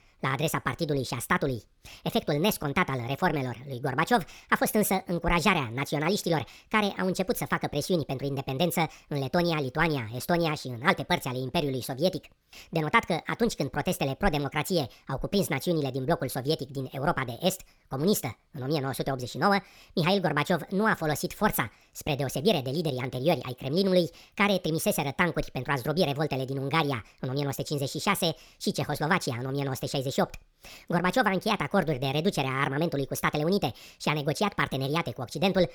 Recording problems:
wrong speed and pitch; too fast and too high; 1.5 times normal speed

